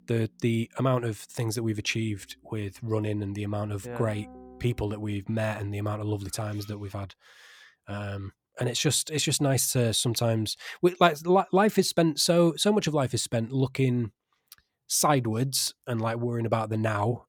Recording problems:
background music; faint; until 5 s; 25 dB below the speech

